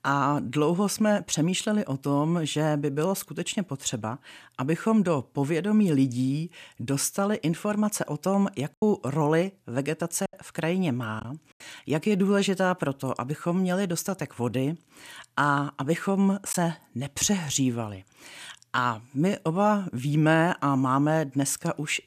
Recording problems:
choppy; occasionally; from 8.5 to 11 s; 5% of the speech affected

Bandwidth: 14.5 kHz